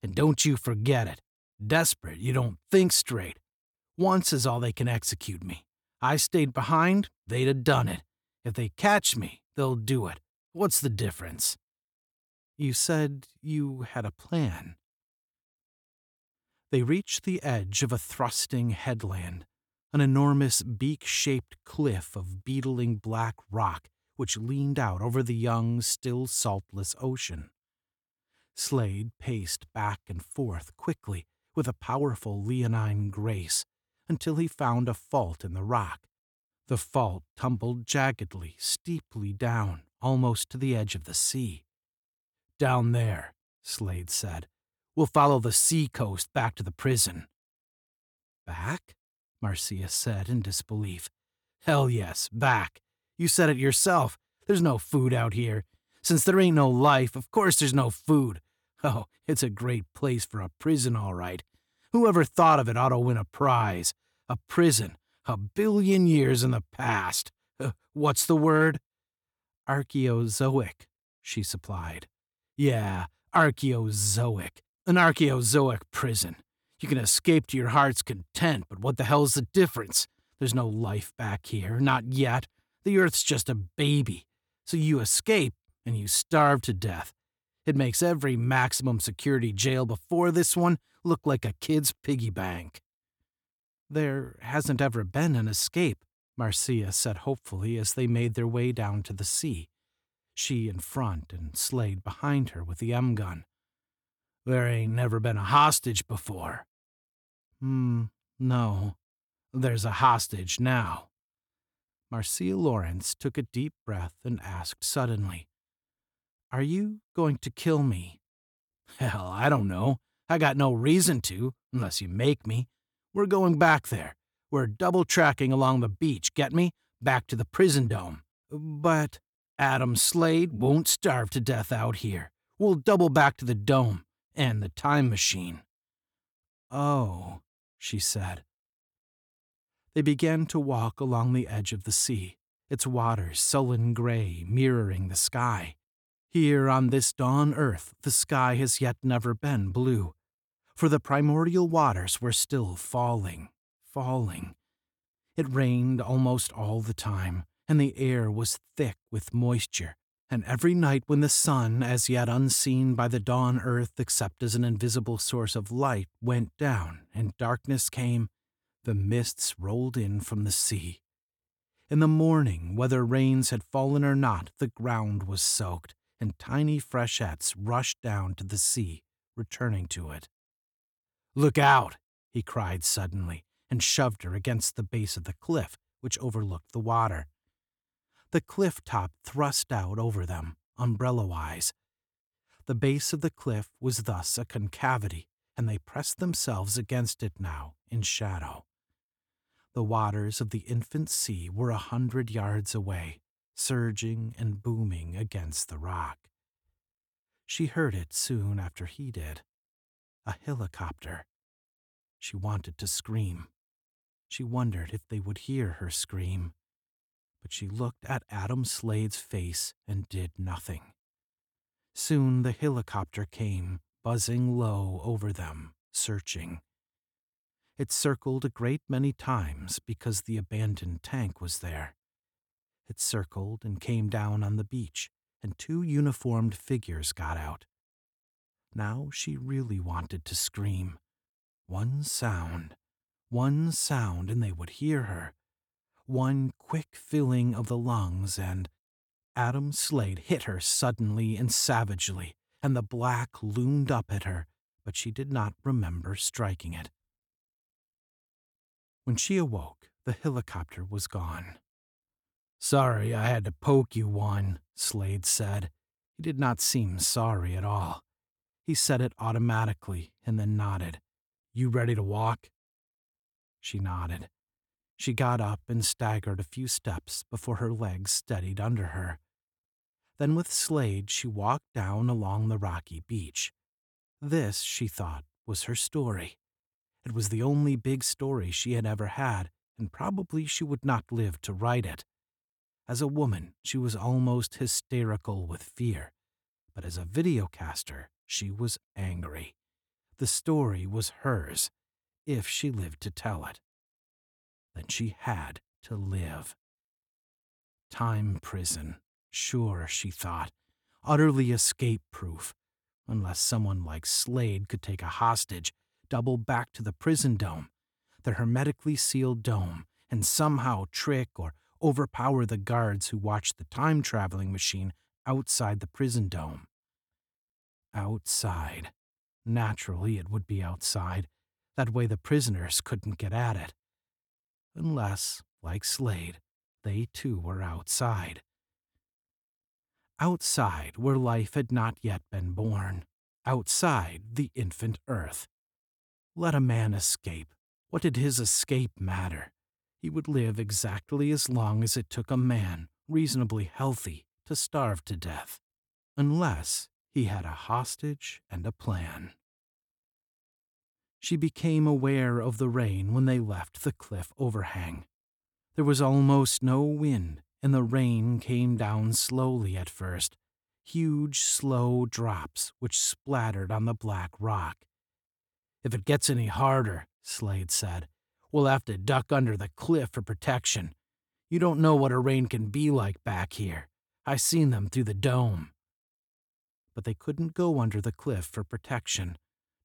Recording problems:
none

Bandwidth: 18.5 kHz